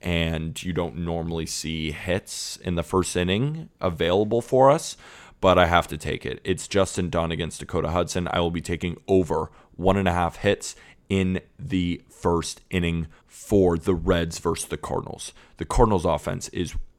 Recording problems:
none

